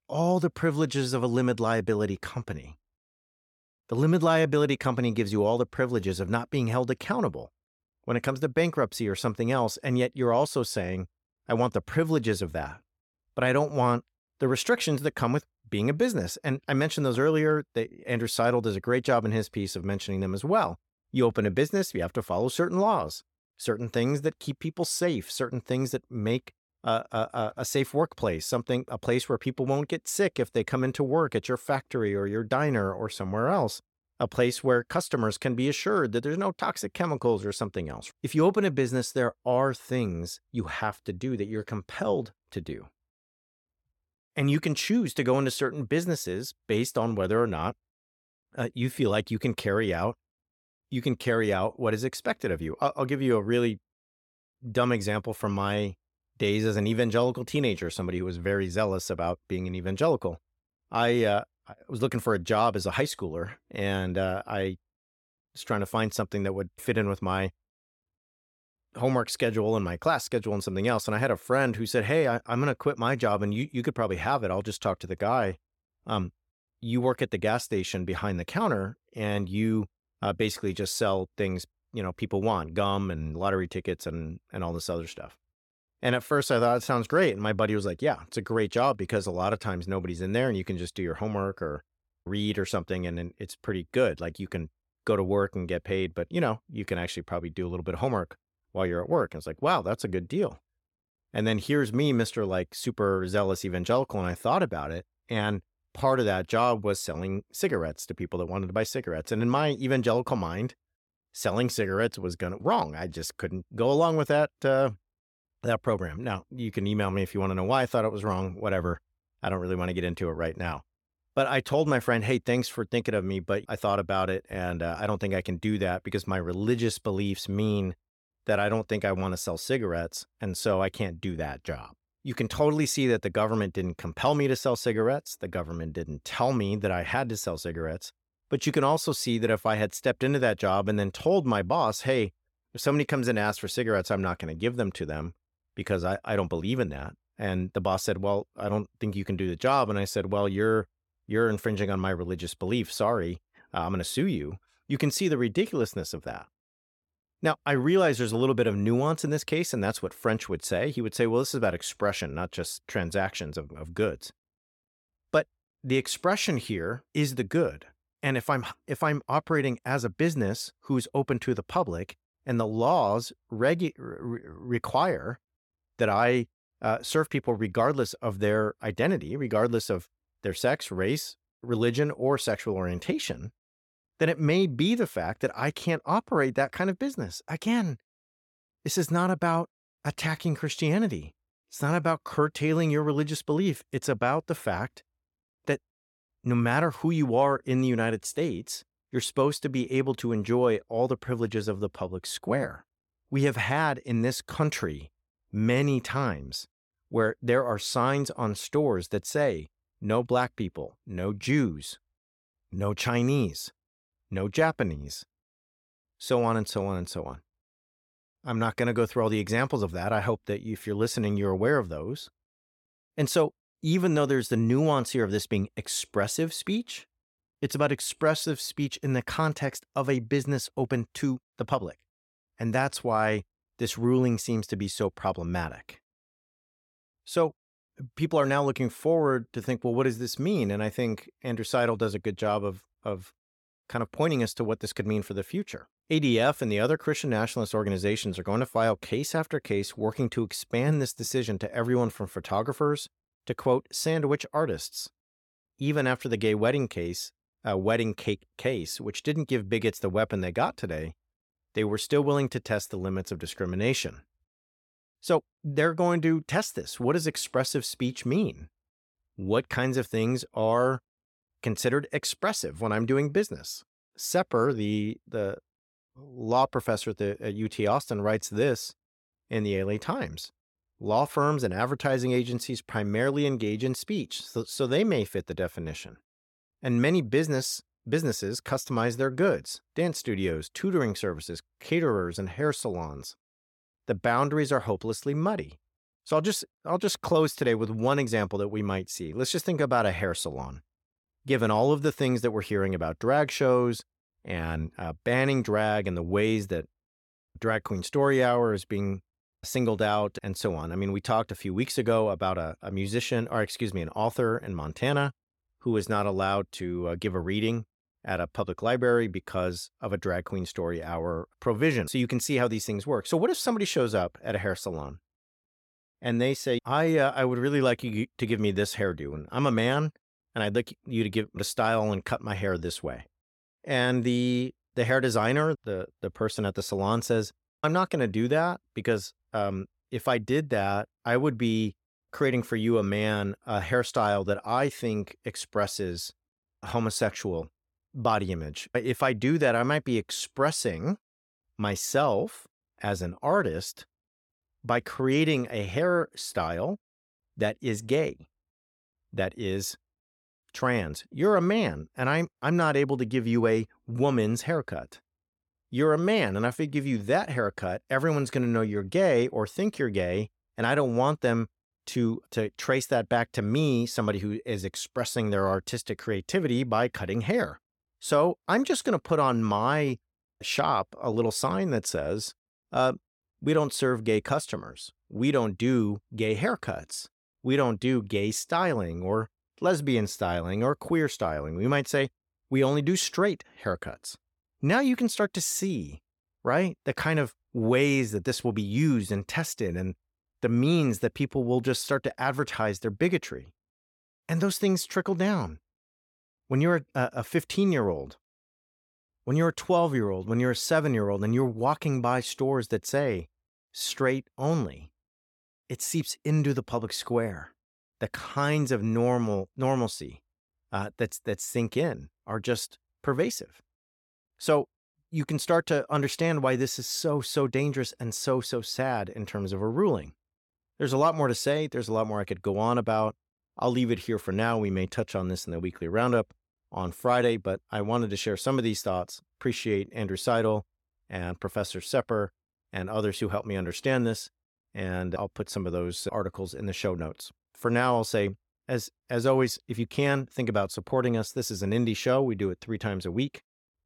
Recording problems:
none

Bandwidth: 17 kHz